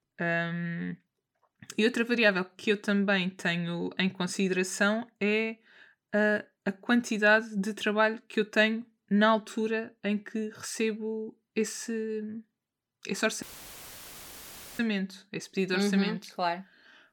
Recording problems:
audio cutting out; filled with static; at 13 s for 1.5 s

